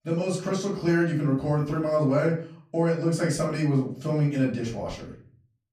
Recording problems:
off-mic speech; far
room echo; slight; dies away in 0.4 s

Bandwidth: 14.5 kHz